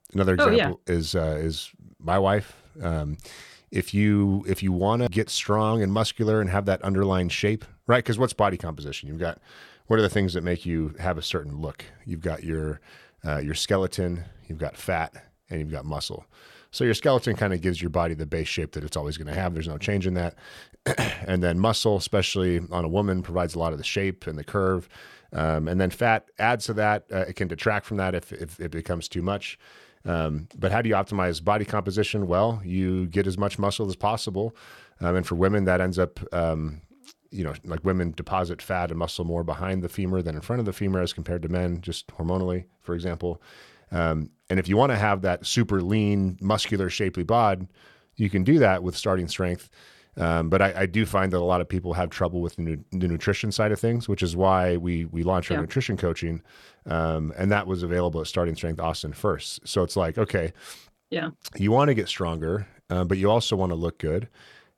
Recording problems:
none

